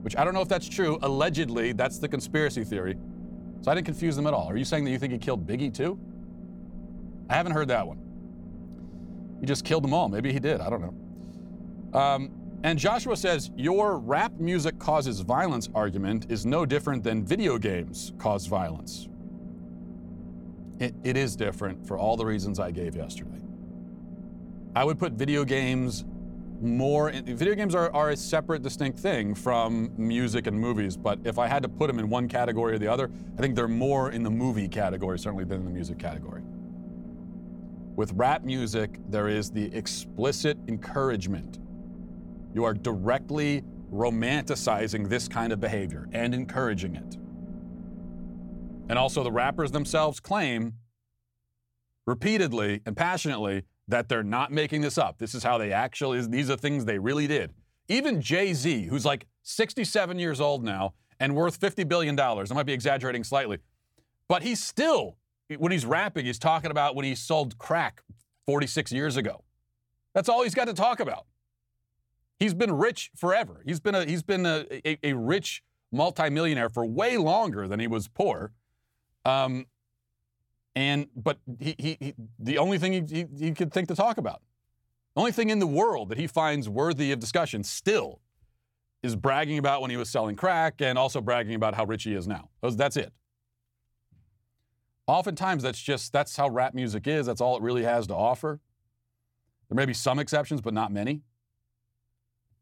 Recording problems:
low rumble; faint; until 50 s; 20 dB below the speech

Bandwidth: 17.5 kHz